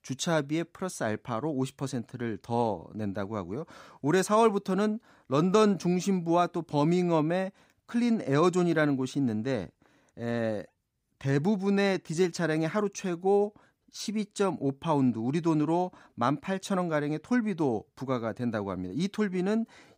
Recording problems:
none

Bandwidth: 15.5 kHz